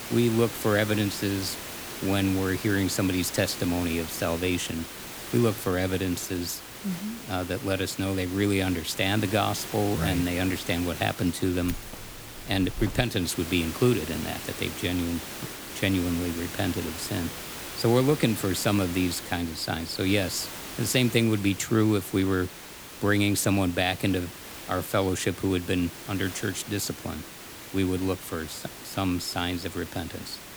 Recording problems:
hiss; loud; throughout; 10 dB below the speech
jangling keys; faint; from 12 to 13 s; peak 15 dB below the speech

